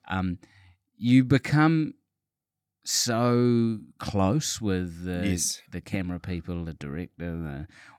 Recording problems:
none

